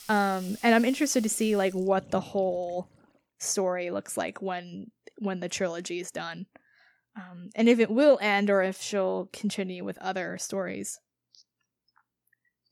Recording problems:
household noises; noticeable; until 3 s; 20 dB below the speech

